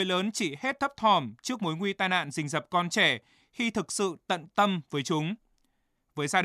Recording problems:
abrupt cut into speech; at the start and the end

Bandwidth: 14.5 kHz